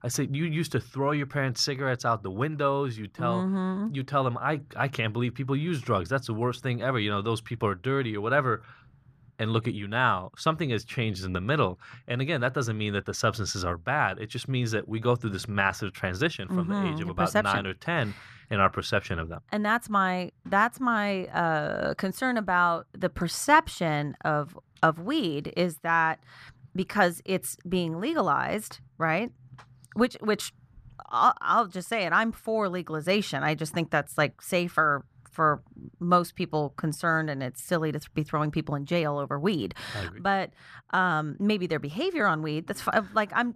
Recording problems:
muffled; very slightly; fading above 2.5 kHz

